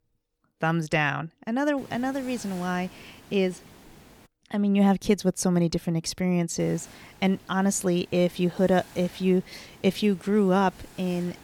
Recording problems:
hiss; faint; from 2 to 4.5 s and from 6.5 s on; 25 dB below the speech

